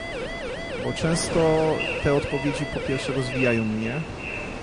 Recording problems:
echo of what is said; strong; throughout; 410 ms later, 8 dB below the speech
garbled, watery; slightly; nothing above 10 kHz
wind noise on the microphone; heavy; 9 dB below the speech
siren; noticeable; until 3.5 s; peak 7 dB below the speech

